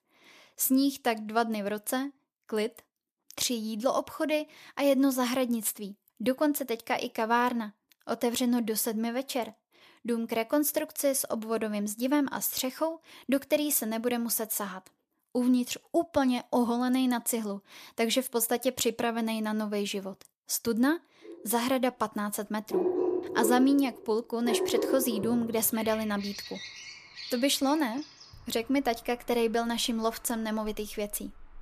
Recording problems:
animal sounds; loud; from 22 s on; 6 dB below the speech

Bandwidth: 14.5 kHz